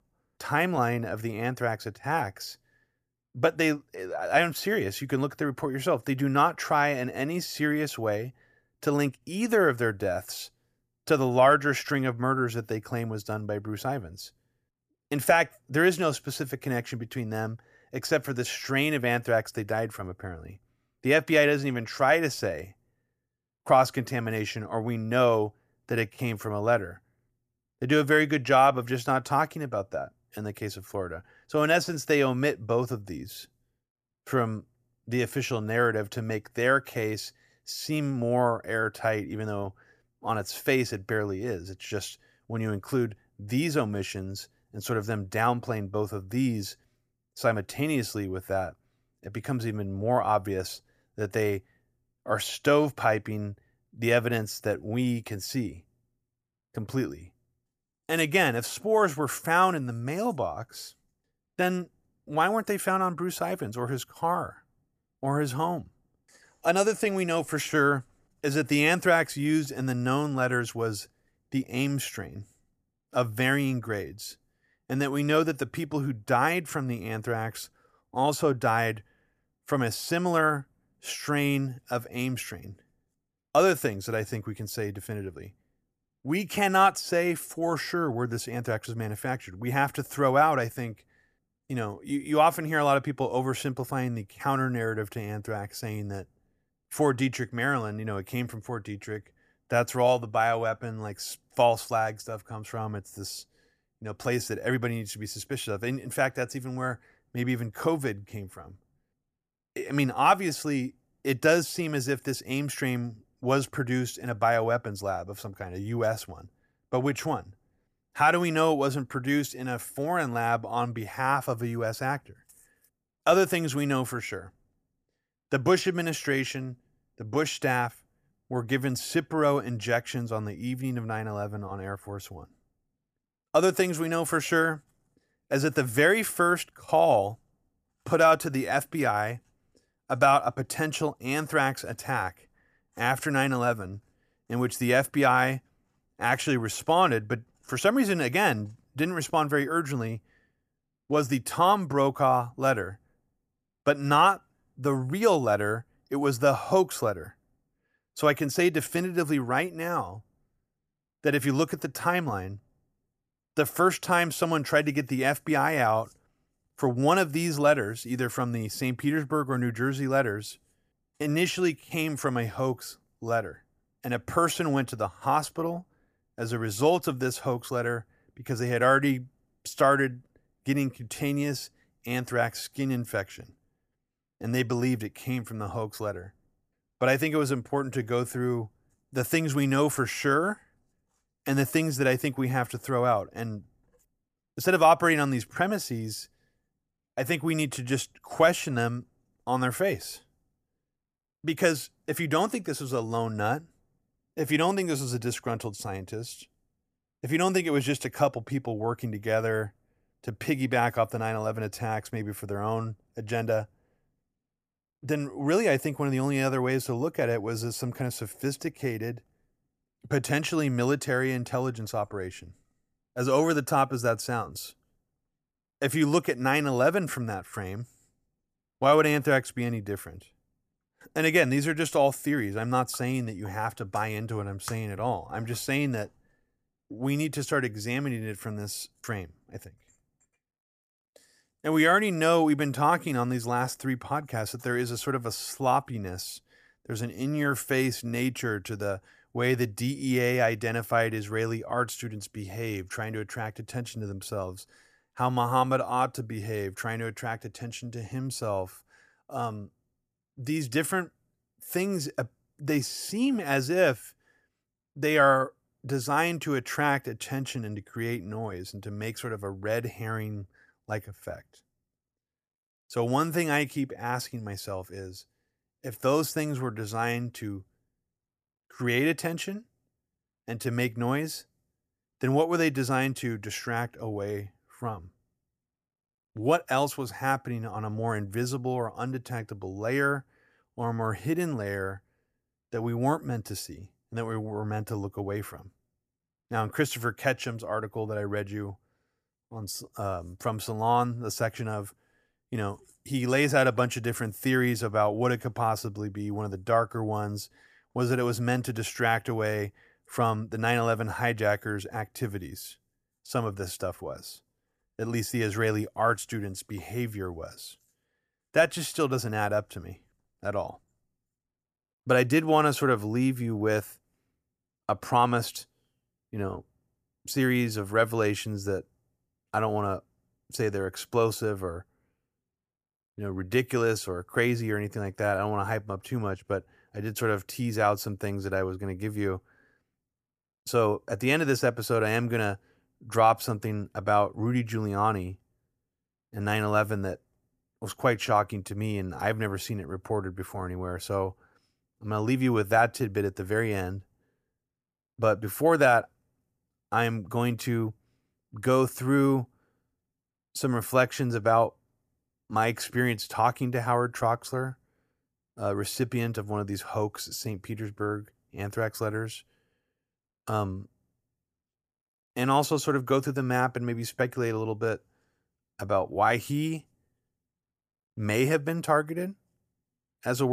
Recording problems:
abrupt cut into speech; at the end

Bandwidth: 14.5 kHz